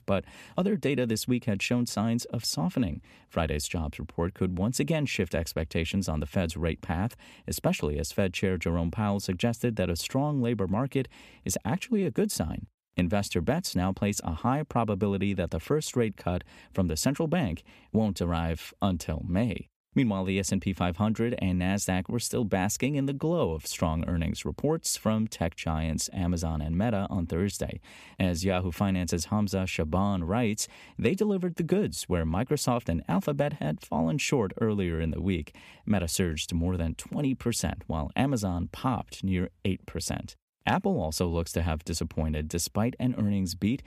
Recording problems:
none

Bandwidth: 14.5 kHz